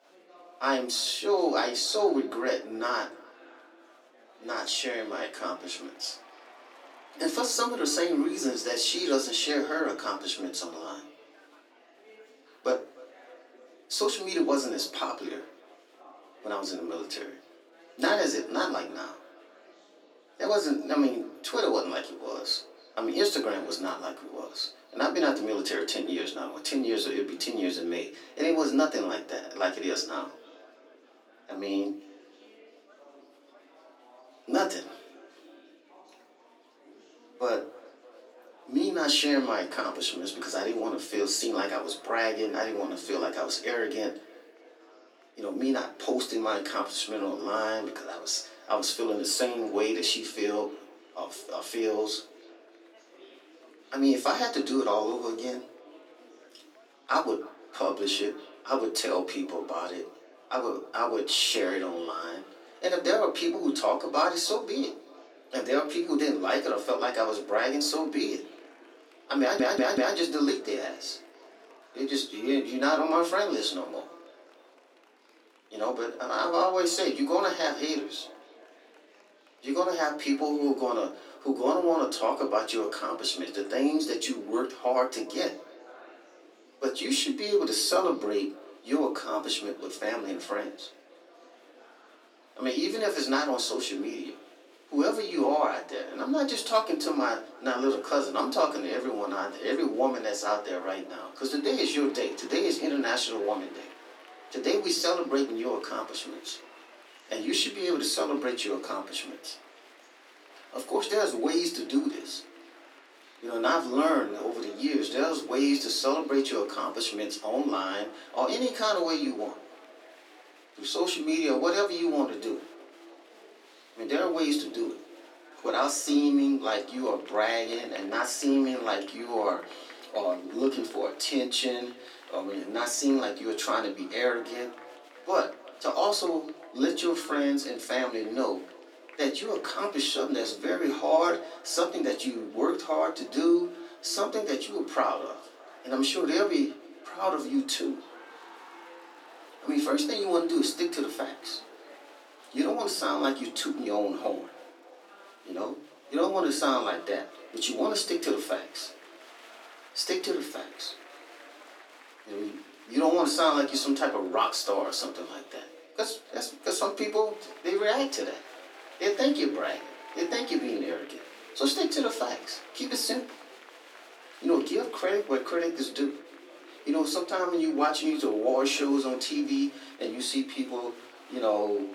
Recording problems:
off-mic speech; far
echo of what is said; faint; throughout; 300 ms later, 25 dB below the speech
room echo; very slight; dies away in 0.3 s
thin; very slightly; fading below 300 Hz
murmuring crowd; faint; throughout; 25 dB below the speech
audio stuttering; at 1:09

